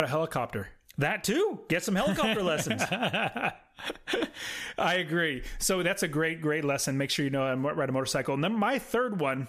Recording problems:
squashed, flat; heavily
abrupt cut into speech; at the start

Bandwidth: 14.5 kHz